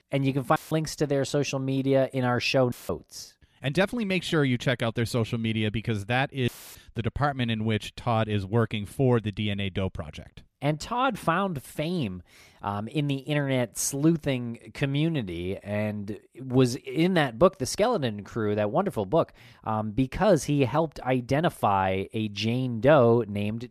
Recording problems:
audio cutting out; filled with static; at 0.5 s, at 2.5 s and at 6.5 s

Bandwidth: 14.5 kHz